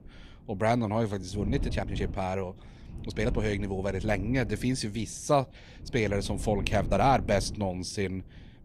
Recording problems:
wind noise on the microphone; occasional gusts; 20 dB below the speech
uneven, jittery; strongly; from 1 to 8 s

